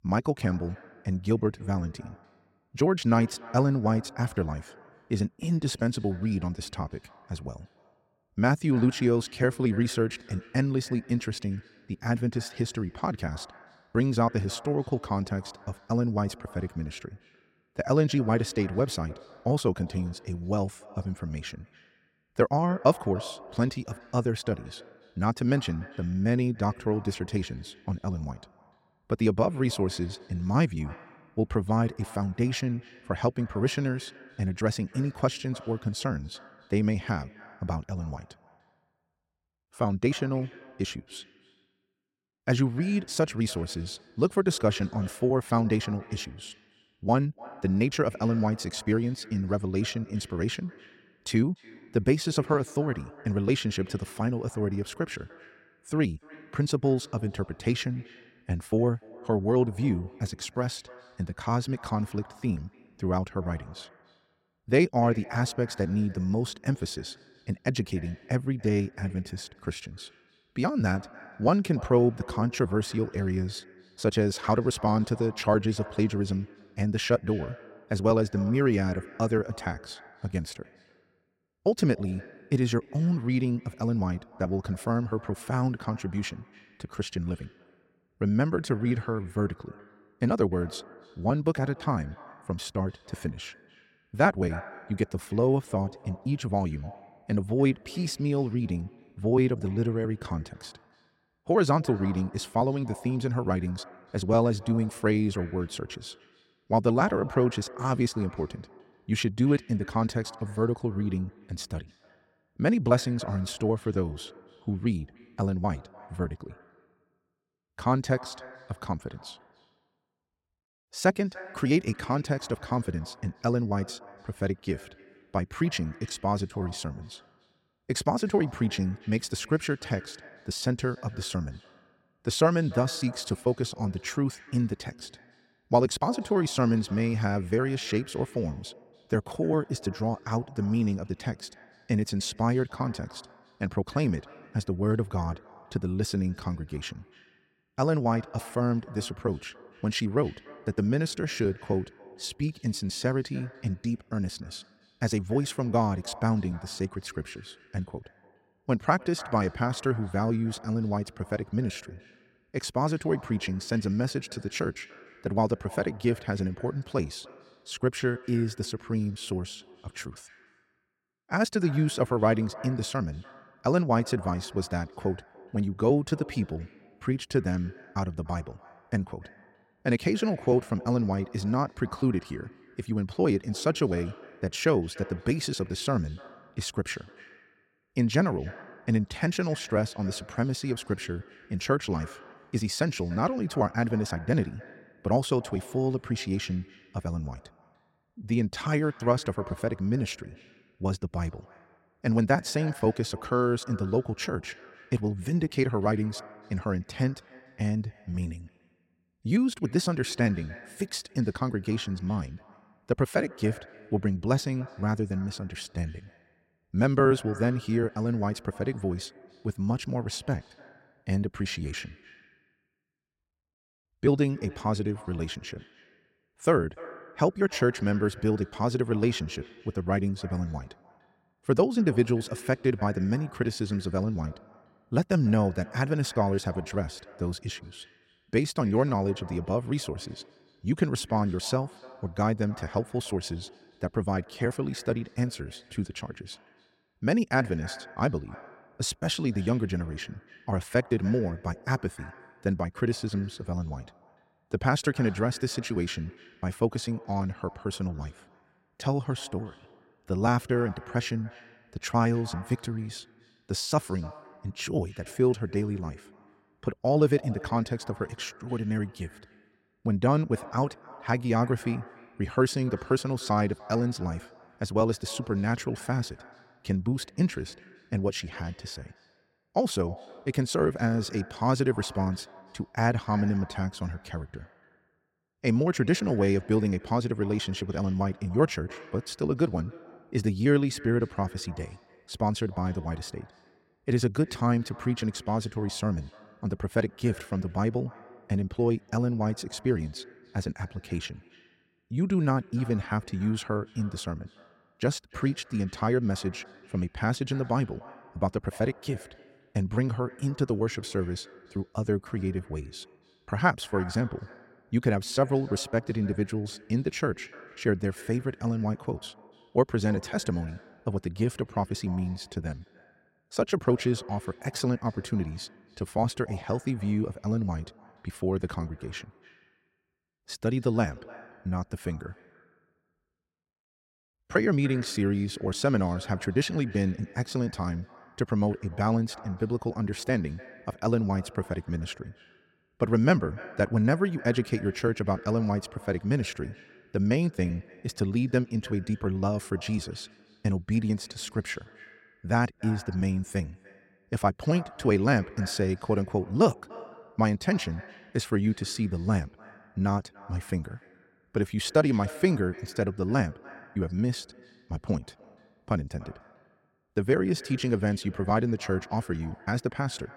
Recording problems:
echo of what is said; faint; throughout; 290 ms later, 20 dB below the speech

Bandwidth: 16 kHz